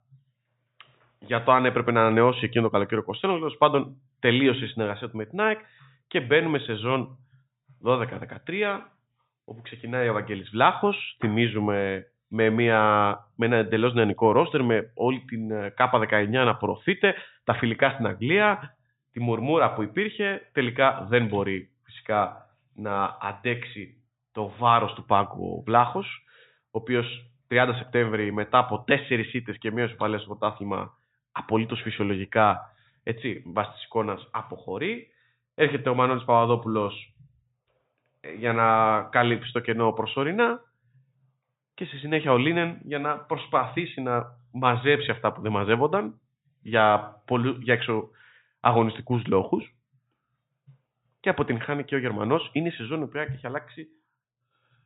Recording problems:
high frequencies cut off; severe; nothing above 4 kHz

